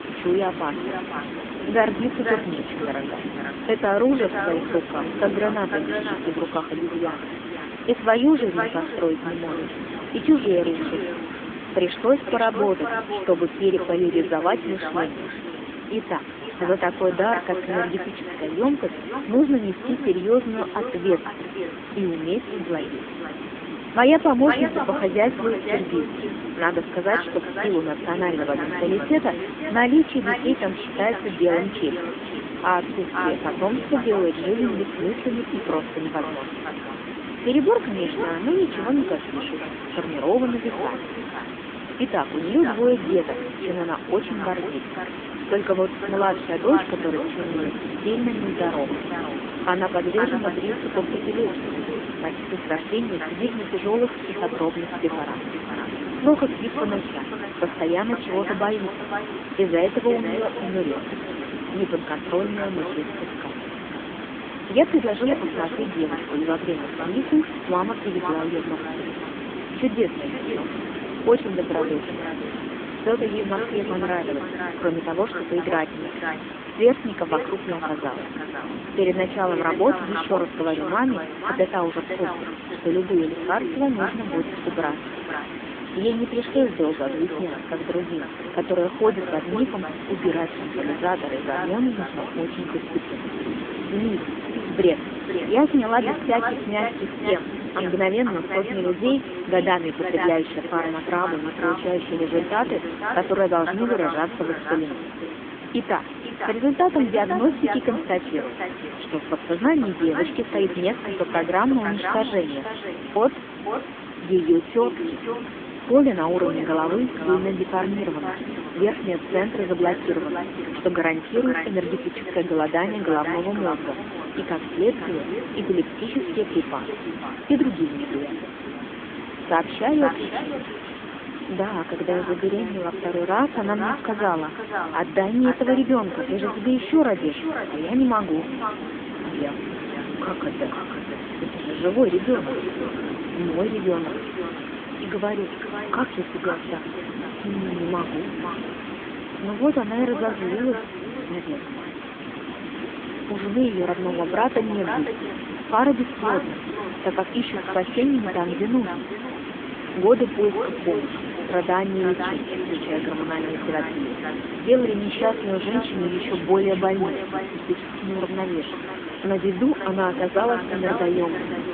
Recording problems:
phone-call audio; poor line
echo of what is said; strong; throughout; 500 ms later, 9 dB below the speech
hiss; loud; throughout; 9 dB below the speech

